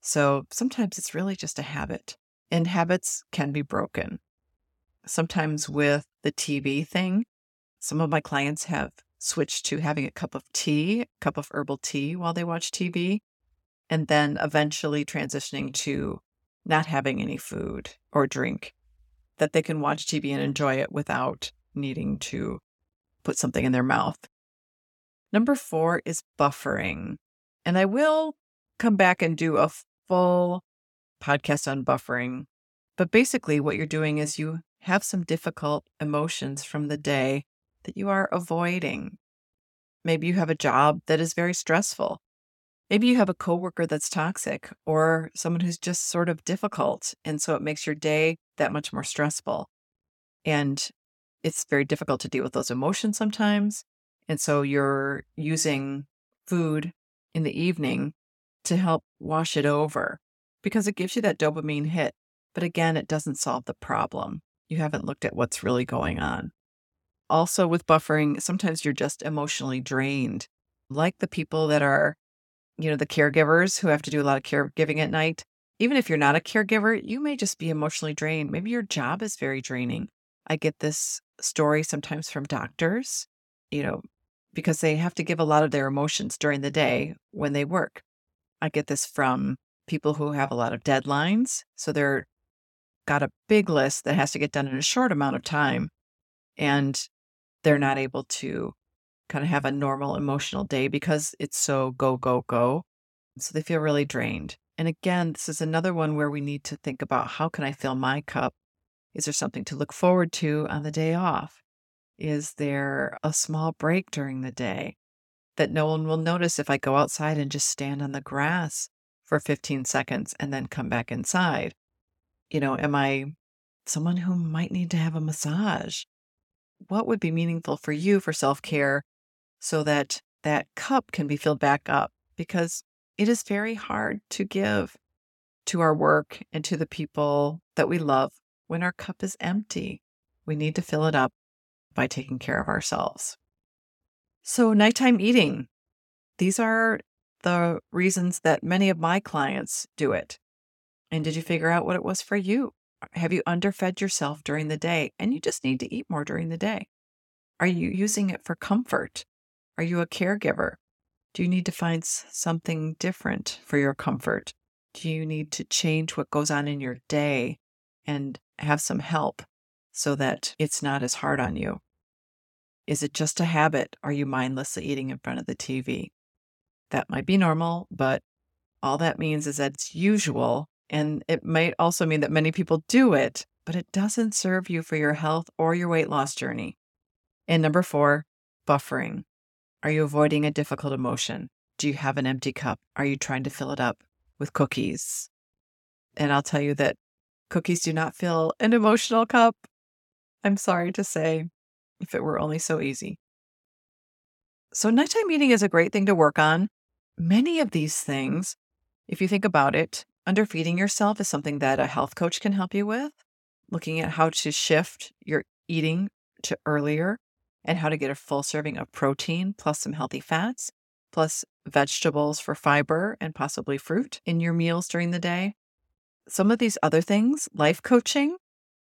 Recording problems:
none

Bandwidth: 17 kHz